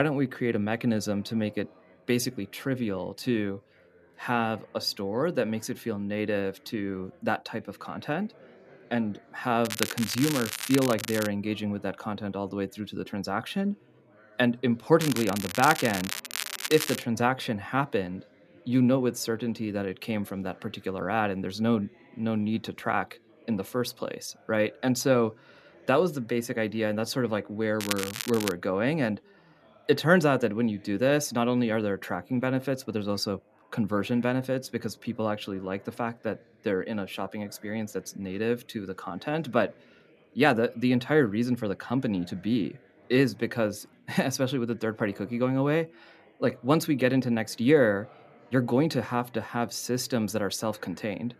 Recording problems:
crackling; loud; from 9.5 to 11 s, from 15 to 17 s and at 28 s; 5 dB below the speech
background chatter; faint; throughout; 4 voices, 30 dB below the speech
abrupt cut into speech; at the start

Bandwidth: 14.5 kHz